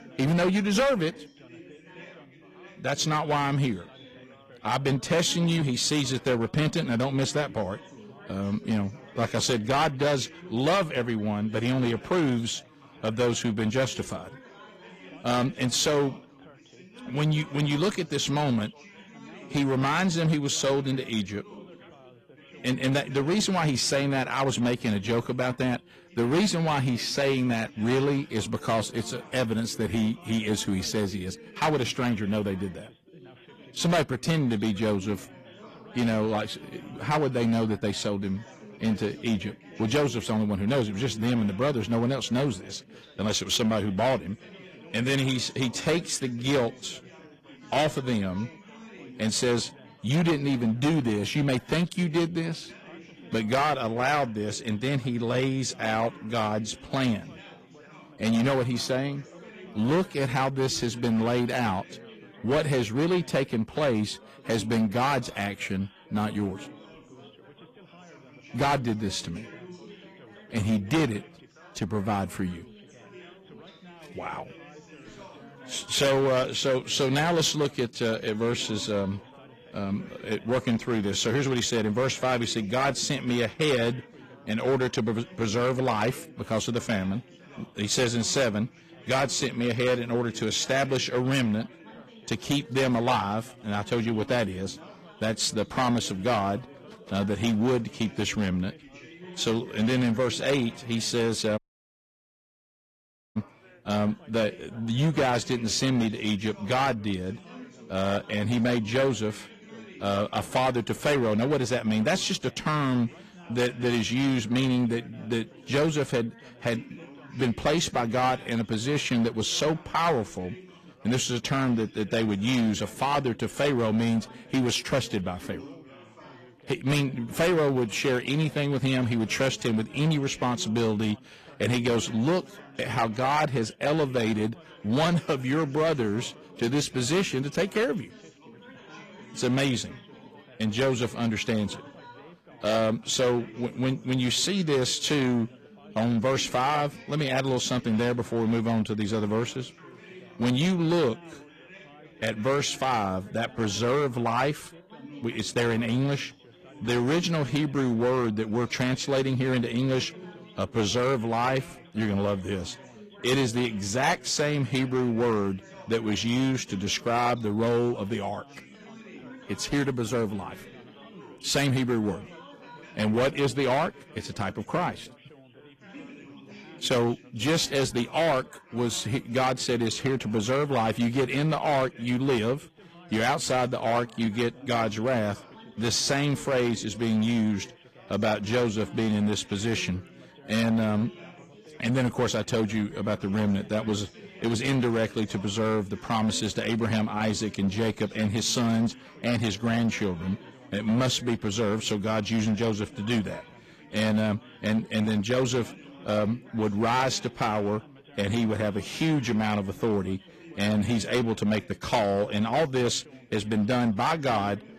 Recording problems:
distortion; slight; 8% of the sound clipped
garbled, watery; slightly; nothing above 15 kHz
background chatter; faint; throughout; 4 voices, 20 dB below the speech
audio cutting out; at 1:42 for 2 s

